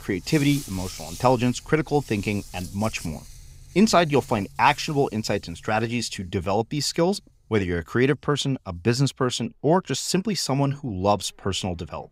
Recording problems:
animal sounds; noticeable; throughout; 20 dB below the speech

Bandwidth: 15.5 kHz